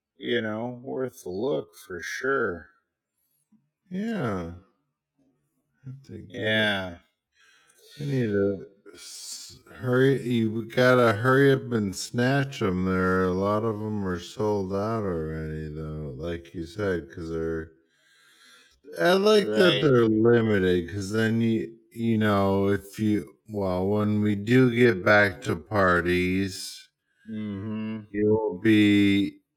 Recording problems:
wrong speed, natural pitch; too slow; 0.5 times normal speed

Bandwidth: 18 kHz